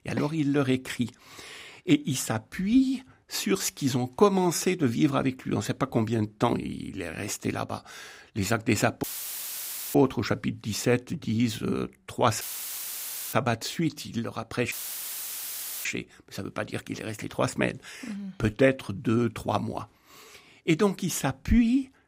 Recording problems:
audio cutting out; filled with static; at 9 s for 1 s, at 12 s for 1 s and at 15 s for 1 s

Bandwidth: 15.5 kHz